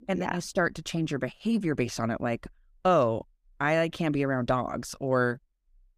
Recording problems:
none

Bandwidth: 15 kHz